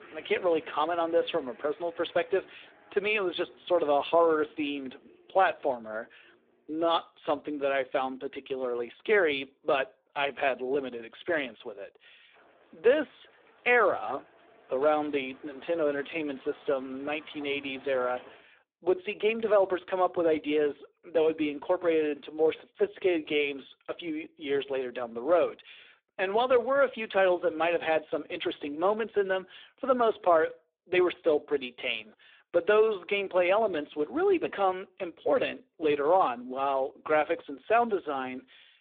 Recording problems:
phone-call audio; poor line
traffic noise; faint; until 18 s; 25 dB below the speech

